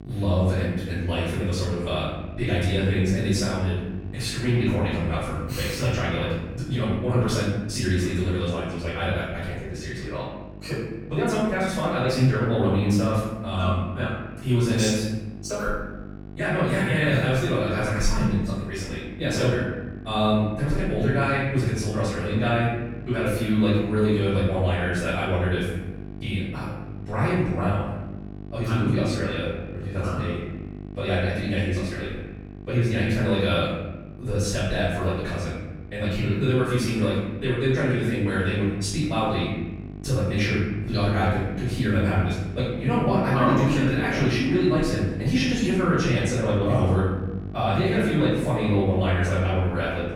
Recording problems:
room echo; strong; dies away in 1 s
off-mic speech; far
wrong speed, natural pitch; too fast; 1.7 times normal speed
electrical hum; noticeable; throughout; 50 Hz, 20 dB below the speech

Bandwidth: 17 kHz